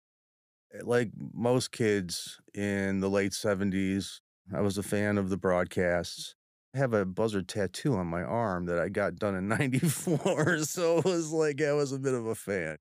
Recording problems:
none

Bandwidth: 15 kHz